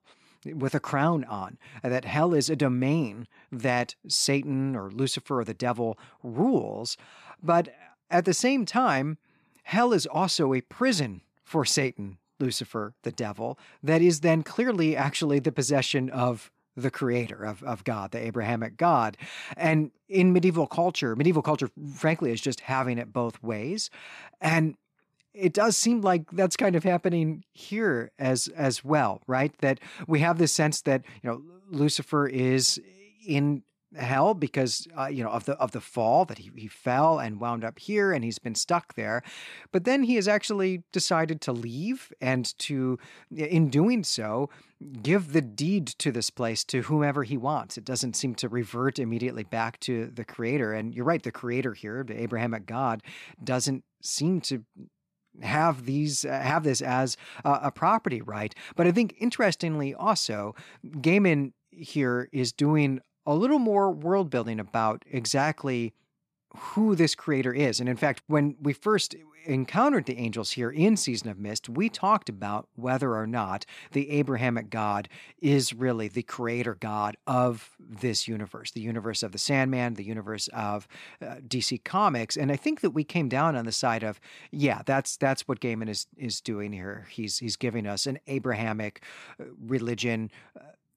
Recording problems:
none

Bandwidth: 14.5 kHz